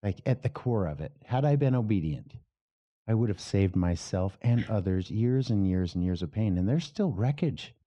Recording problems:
muffled; very; fading above 2.5 kHz

